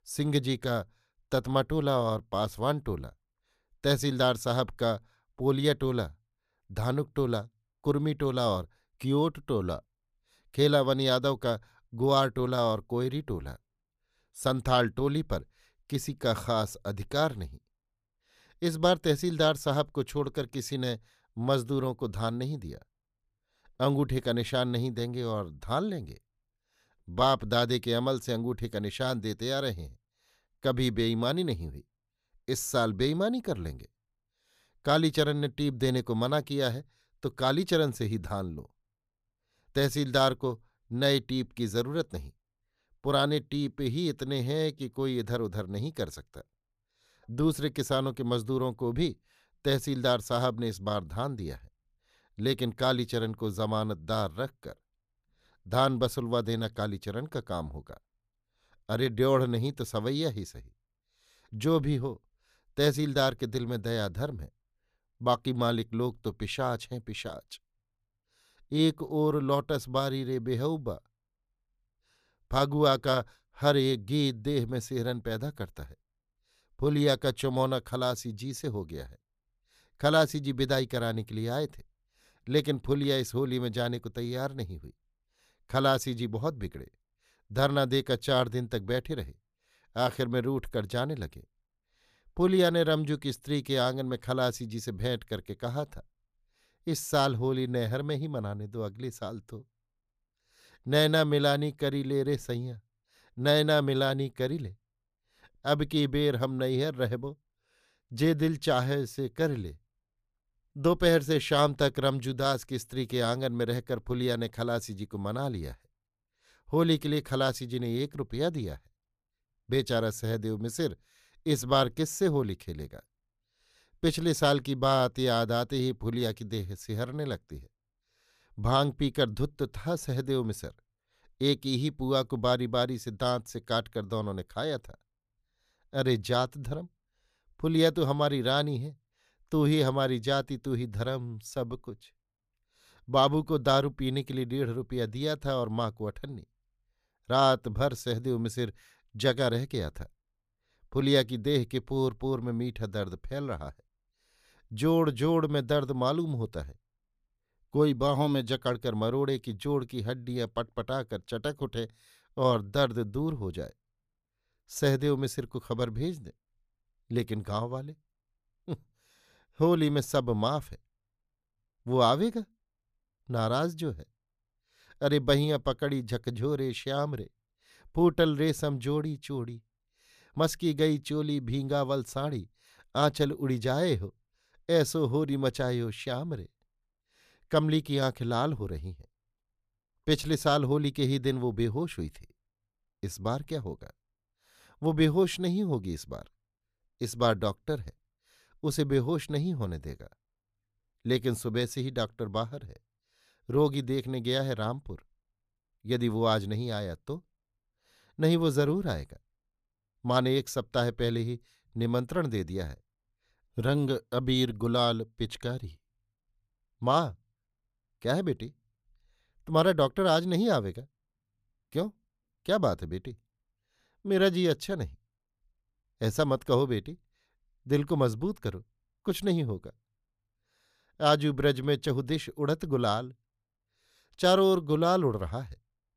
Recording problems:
none

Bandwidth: 14.5 kHz